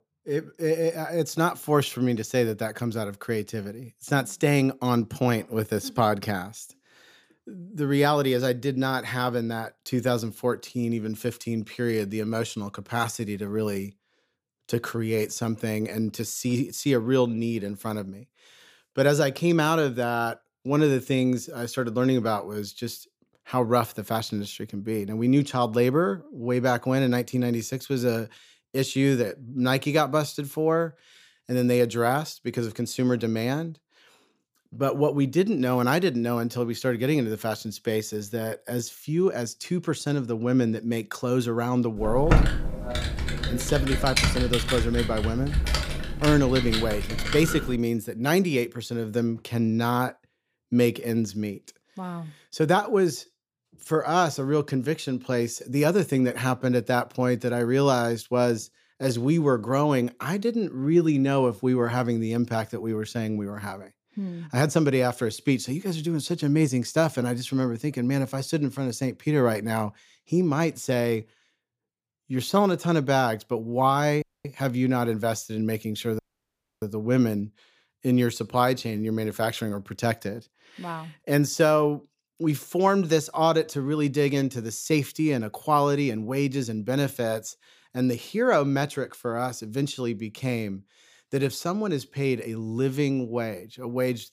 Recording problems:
keyboard typing; loud; from 42 to 48 s; peak 4 dB above the speech
audio cutting out; at 1:14 and at 1:16 for 0.5 s

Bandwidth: 15 kHz